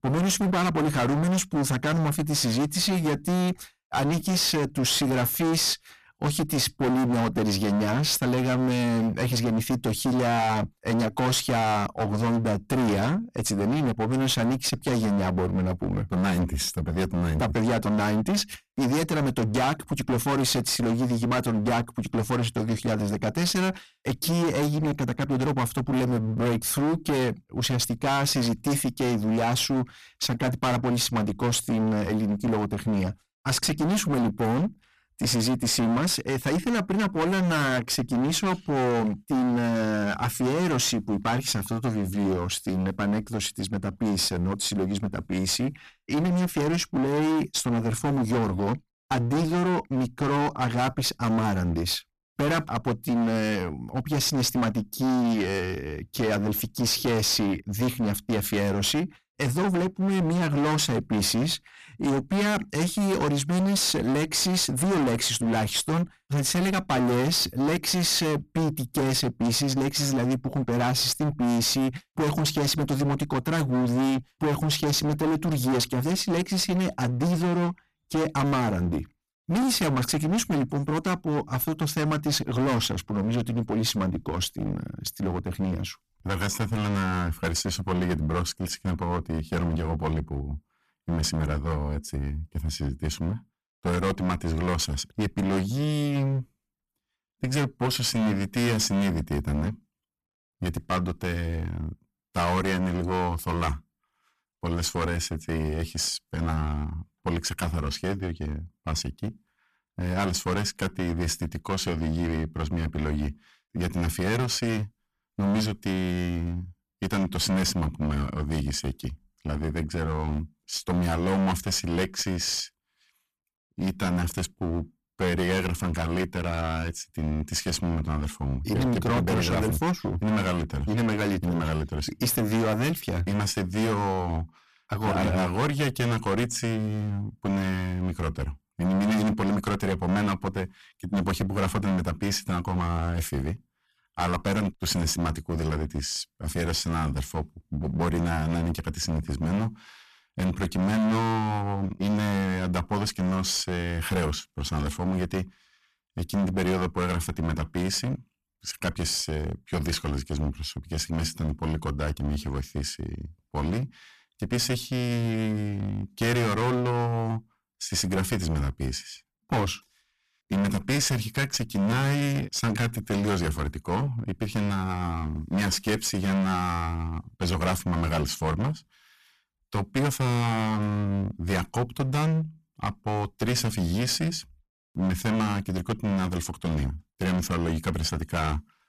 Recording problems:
distortion; heavy; 22% of the sound clipped

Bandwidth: 14.5 kHz